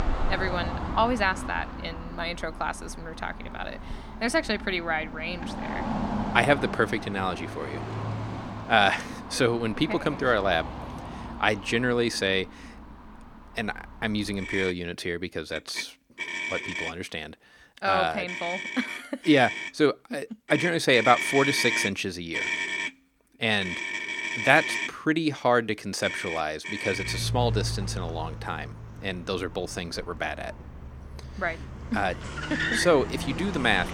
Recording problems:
traffic noise; loud; throughout; 6 dB below the speech

